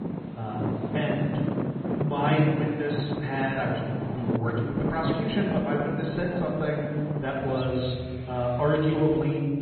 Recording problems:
garbled, watery; badly; nothing above 4 kHz
room echo; noticeable; dies away in 1.6 s
off-mic speech; somewhat distant
traffic noise; loud; throughout; 4 dB below the speech

